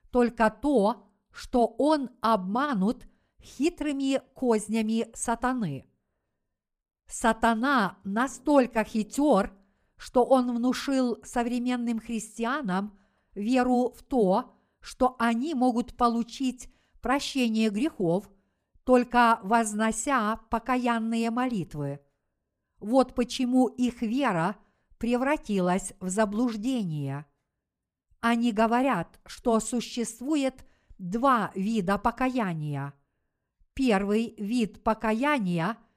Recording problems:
none

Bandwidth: 15 kHz